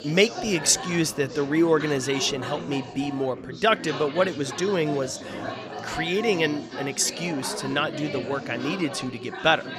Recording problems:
chatter from many people; loud; throughout; 10 dB below the speech

